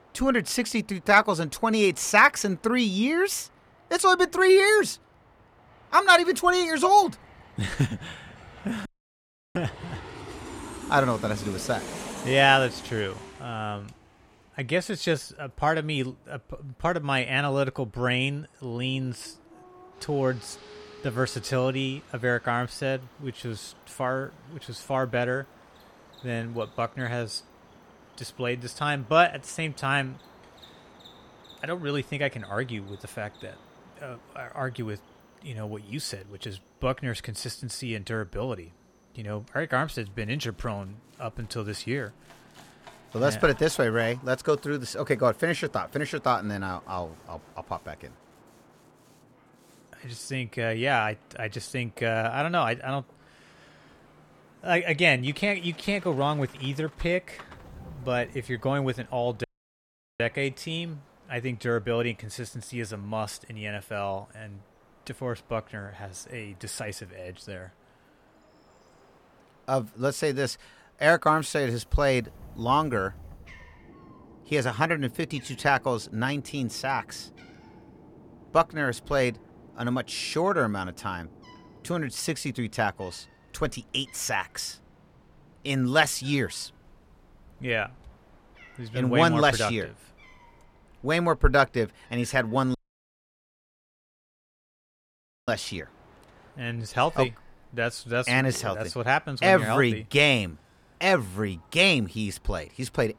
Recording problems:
animal sounds; faint; throughout; 30 dB below the speech
train or aircraft noise; faint; throughout; 25 dB below the speech
audio cutting out; at 9 s for 0.5 s, at 59 s for 1 s and at 1:33 for 2.5 s

